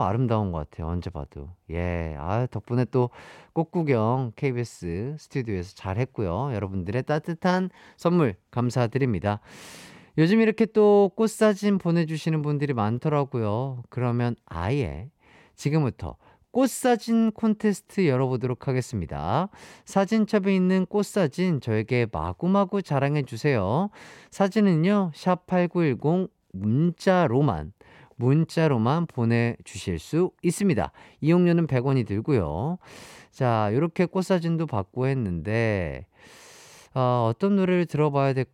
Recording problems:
abrupt cut into speech; at the start

